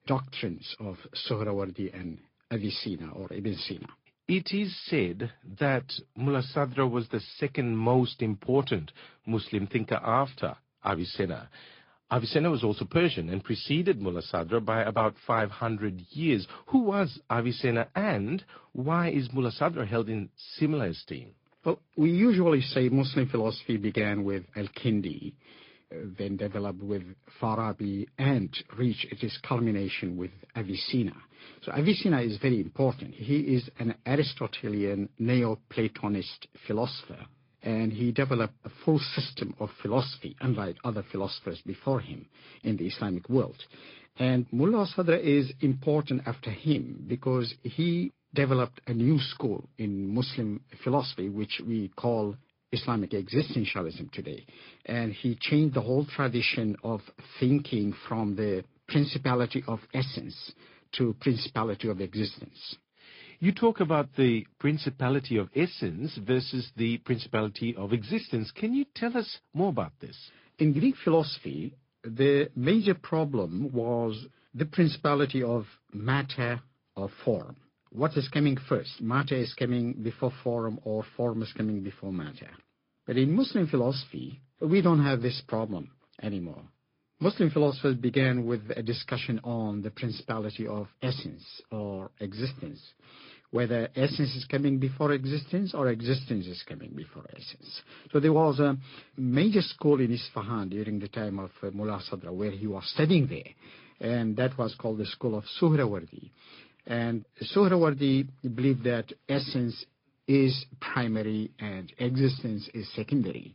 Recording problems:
high frequencies cut off; noticeable; nothing above 5 kHz
garbled, watery; slightly

